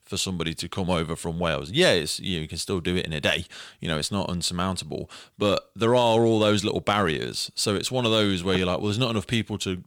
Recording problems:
none

